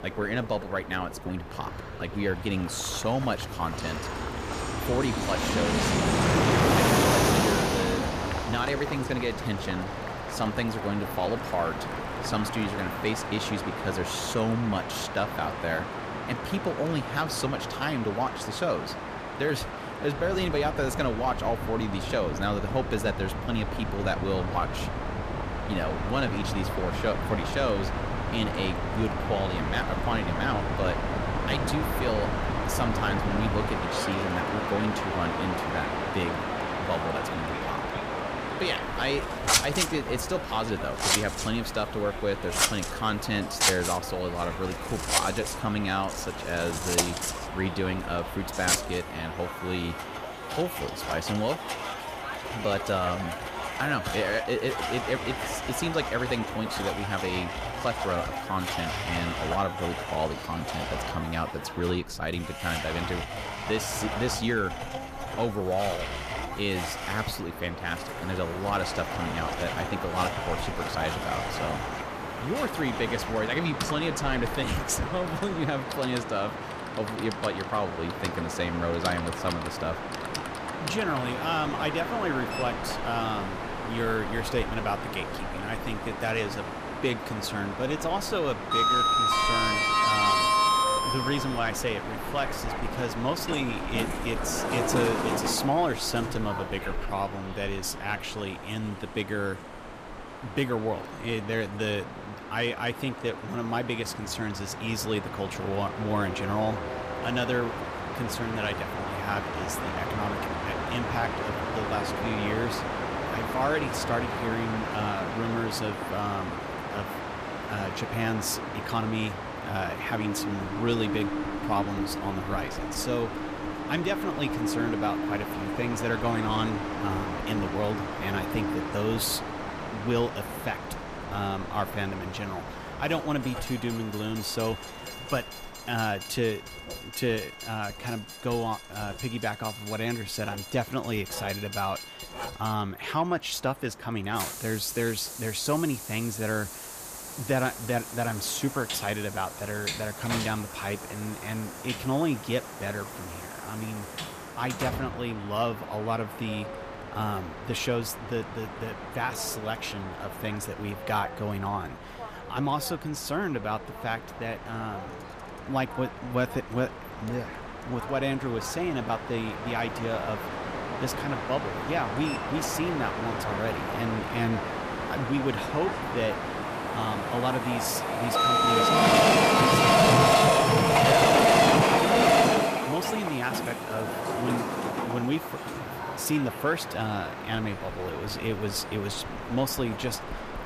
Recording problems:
distortion; slight; 10 dB below the speech
household noises; loud; throughout; 1 dB below the speech
train or aircraft noise; loud; throughout; 1 dB below the speech

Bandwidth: 14.5 kHz